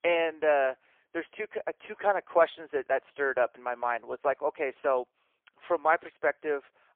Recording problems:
phone-call audio; poor line

